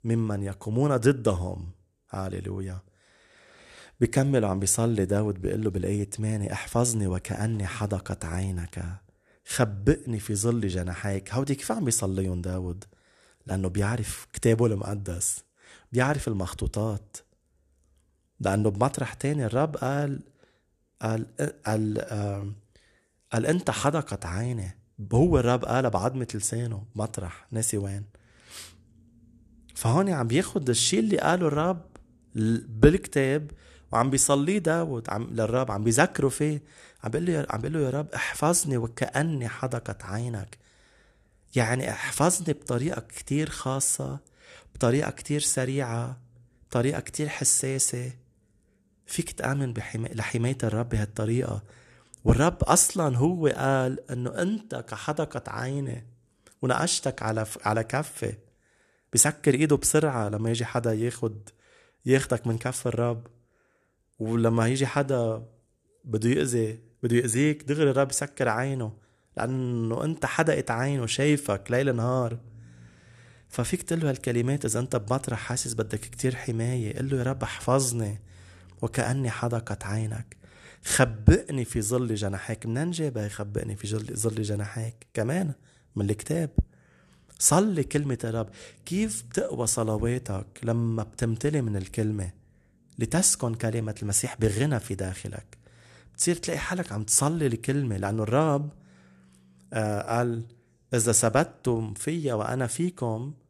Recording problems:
none

